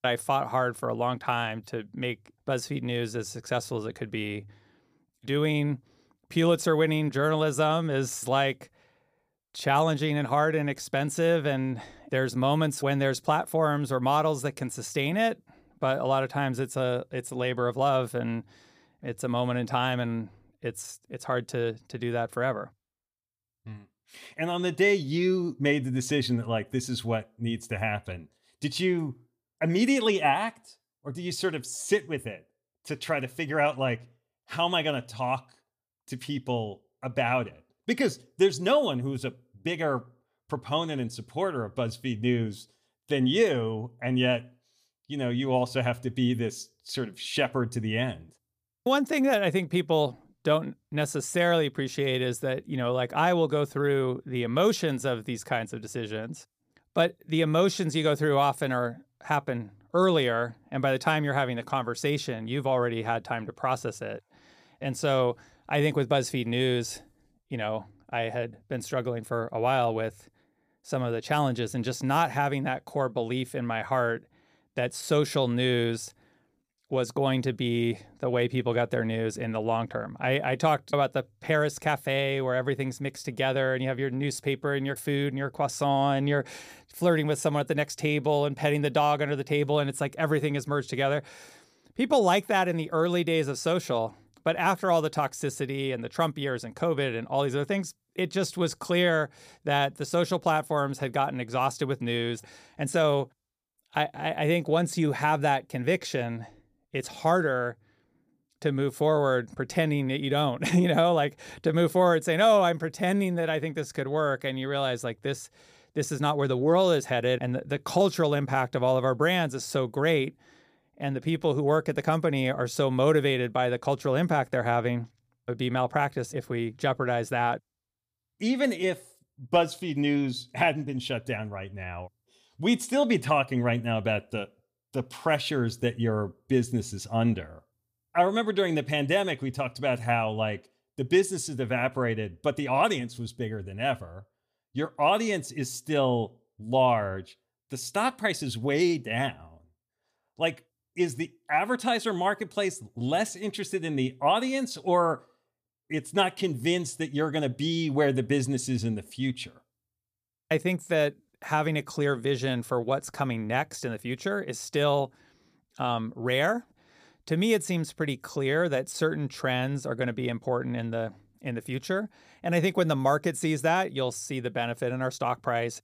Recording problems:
none

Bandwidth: 15 kHz